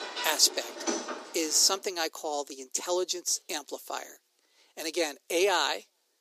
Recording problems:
thin; very; fading below 350 Hz
household noises; loud; until 1.5 s; 9 dB below the speech

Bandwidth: 15 kHz